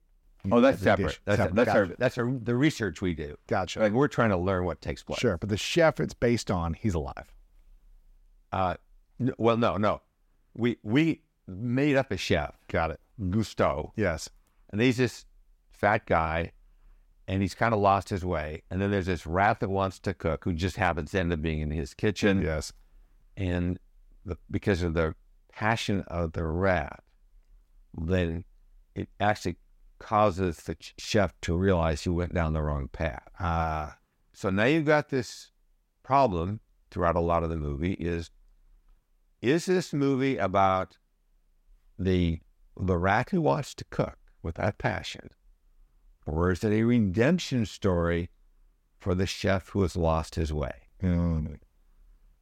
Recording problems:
none

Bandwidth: 16 kHz